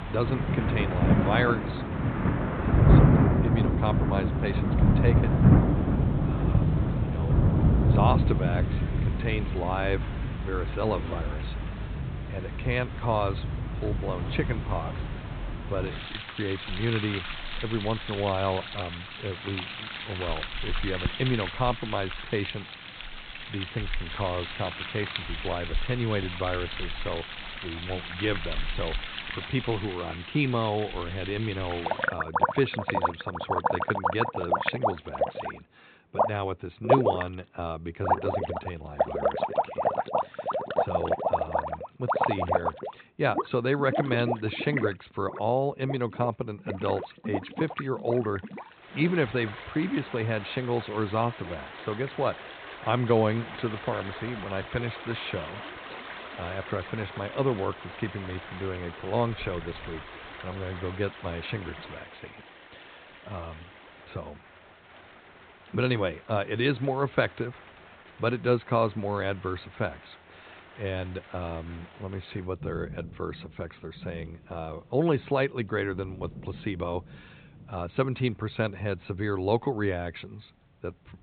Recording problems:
high frequencies cut off; severe; nothing above 4 kHz
rain or running water; very loud; throughout; 2 dB above the speech

